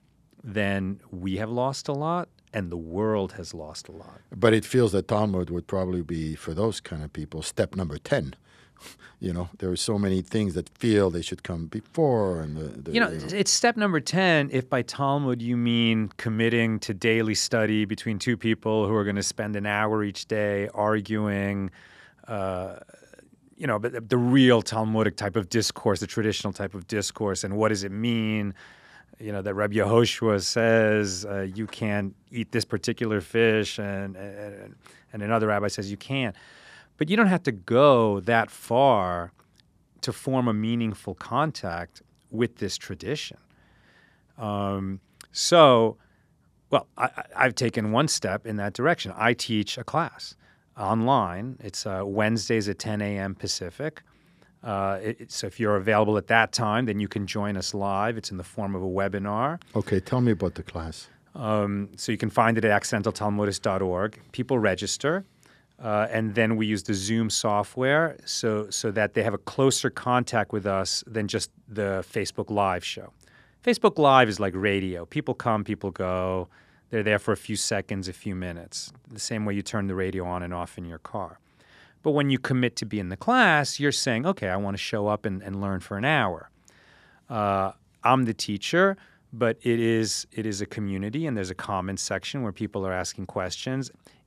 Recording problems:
none

